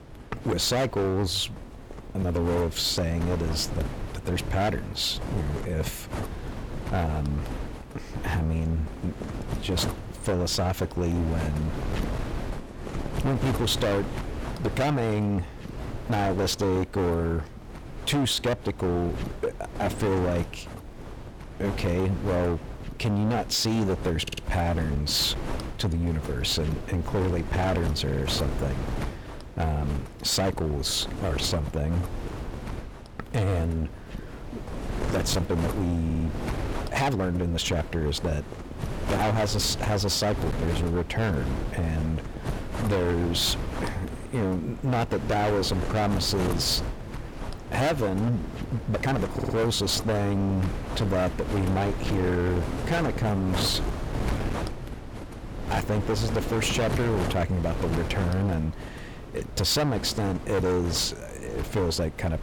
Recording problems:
distortion; heavy; 17% of the sound clipped
wind noise on the microphone; heavy; 10 dB below the speech
uneven, jittery; strongly; from 16 to 49 s
audio stuttering; 4 times, first at 24 s

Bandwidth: 18.5 kHz